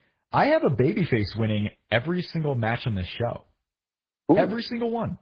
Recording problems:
garbled, watery; badly

